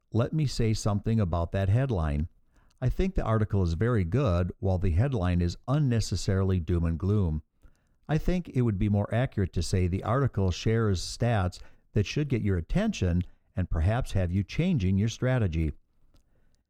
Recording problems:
muffled; slightly; fading above 1.5 kHz

